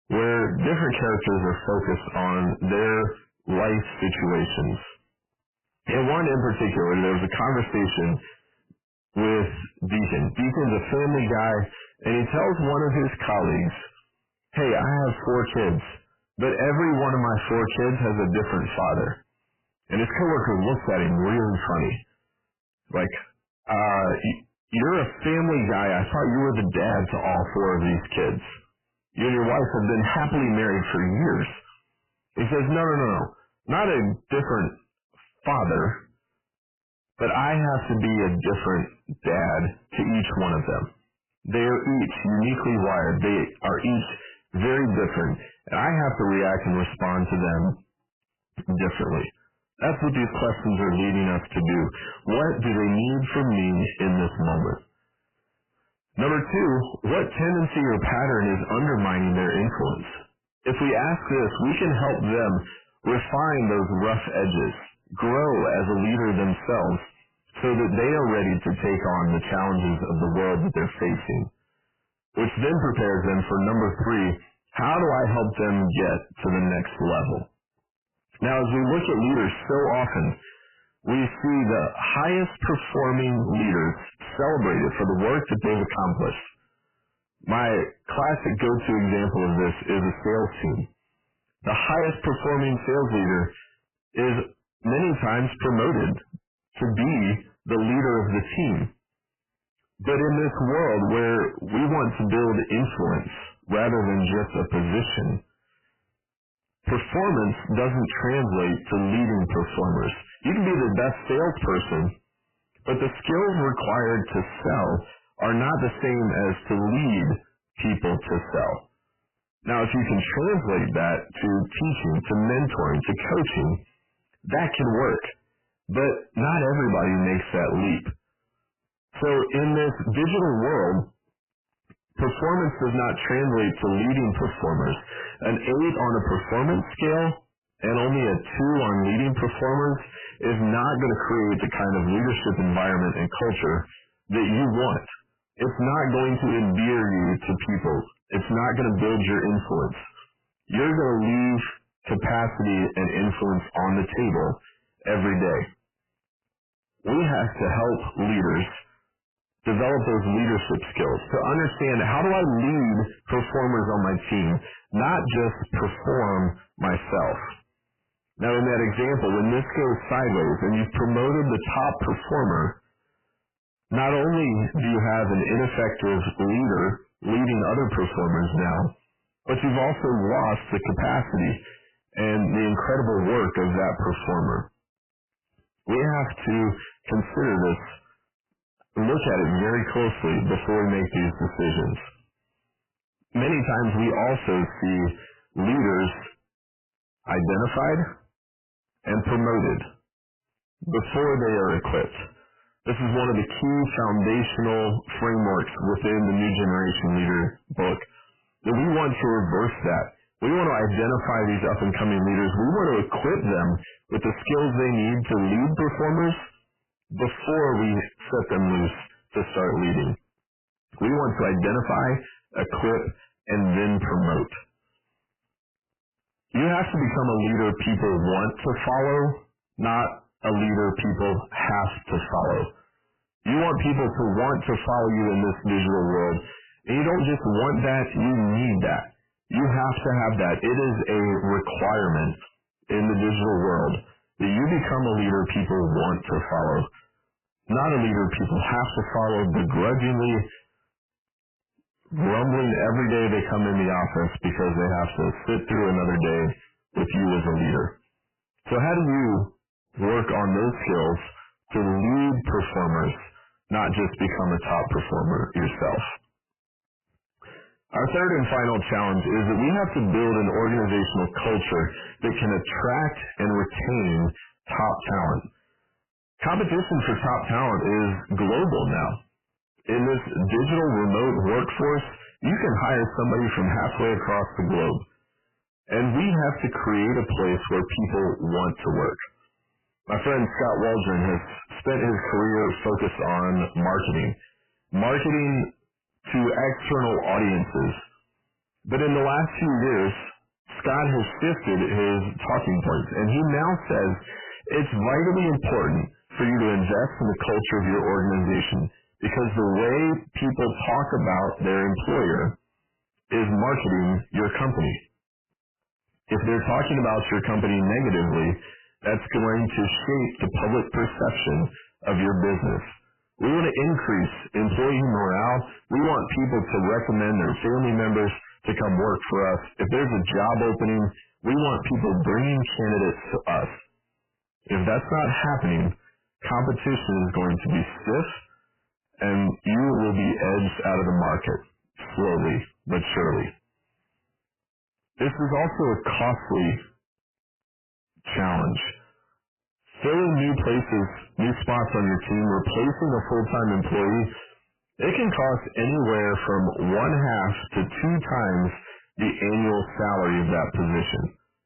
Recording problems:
distortion; heavy; 5 dB below the speech
garbled, watery; badly; nothing above 3 kHz

